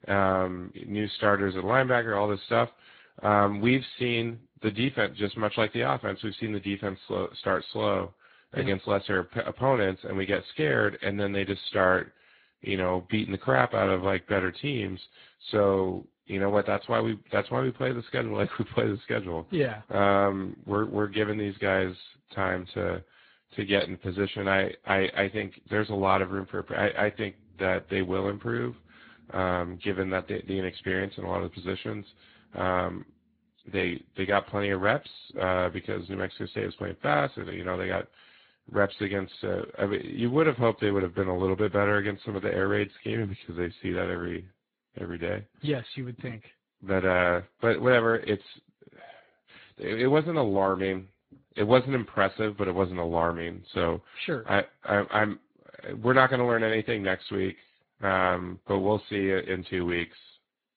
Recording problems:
garbled, watery; badly; nothing above 4 kHz

